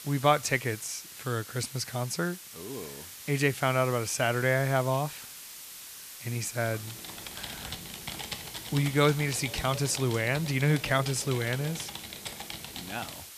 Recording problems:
hiss; noticeable; throughout; 15 dB below the speech
keyboard typing; noticeable; from 6.5 s on; peak 8 dB below the speech

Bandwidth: 14.5 kHz